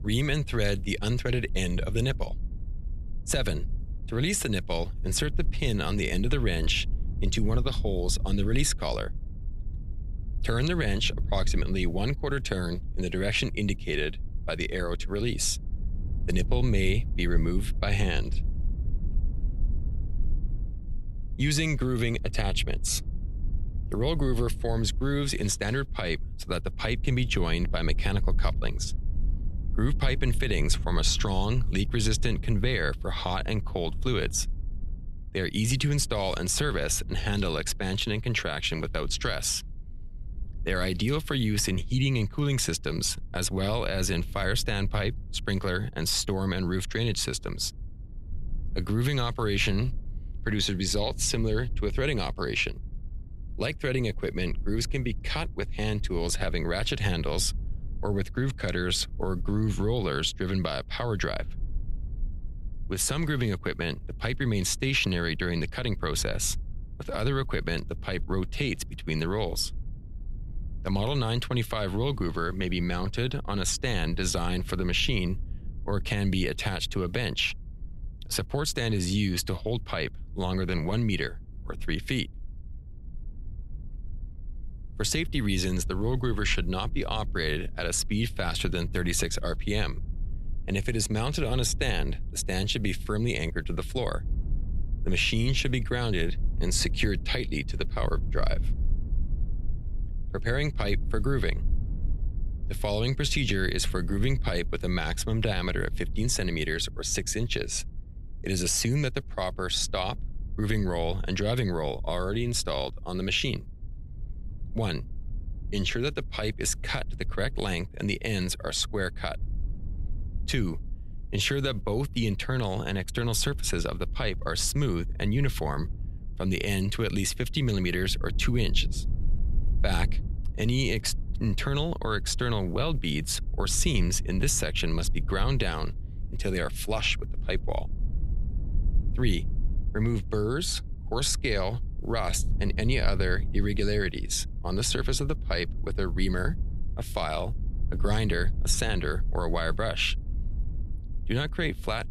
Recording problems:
low rumble; faint; throughout; 25 dB below the speech

